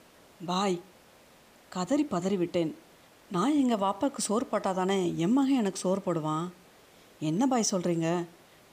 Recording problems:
hiss; faint; throughout; 25 dB below the speech

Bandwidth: 15 kHz